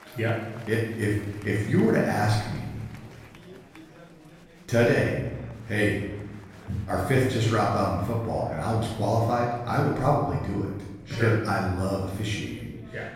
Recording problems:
off-mic speech; far
room echo; noticeable; dies away in 1 s
chatter from many people; faint; throughout; 20 dB below the speech

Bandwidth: 16 kHz